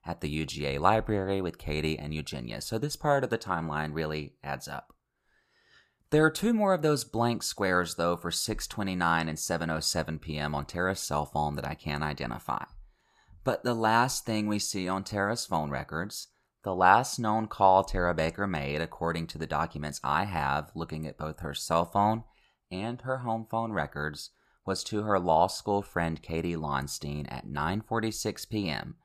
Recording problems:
none

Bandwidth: 14.5 kHz